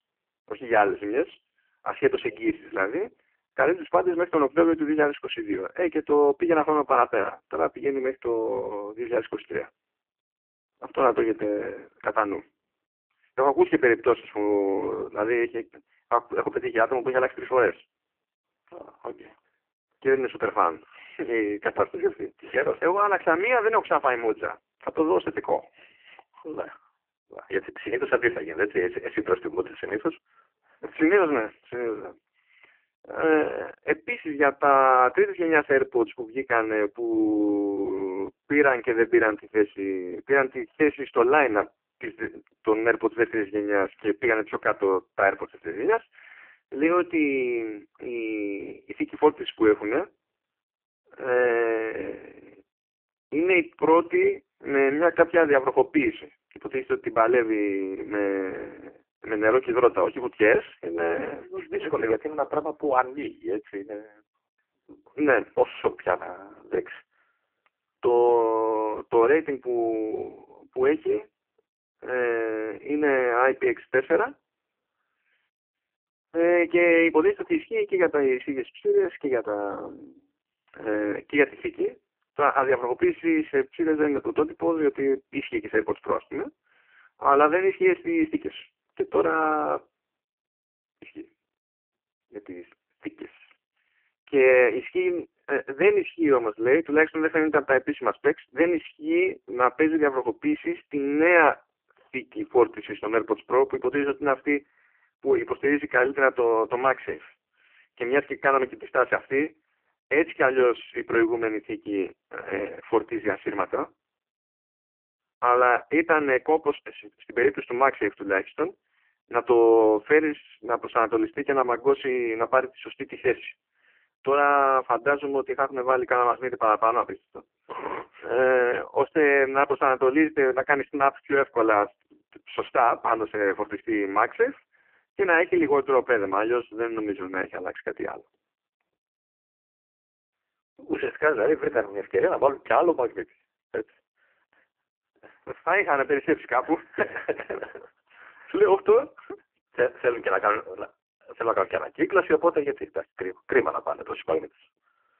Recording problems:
phone-call audio; poor line

